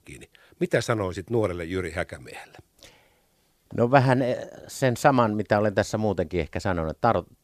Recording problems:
none

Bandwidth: 14.5 kHz